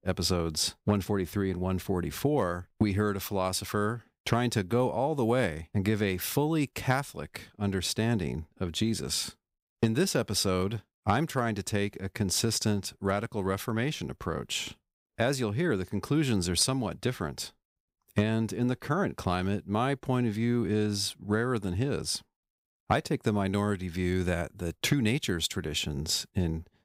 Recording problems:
none

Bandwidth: 15.5 kHz